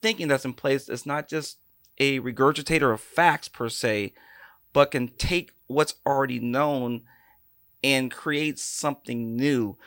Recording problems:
none

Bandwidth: 16 kHz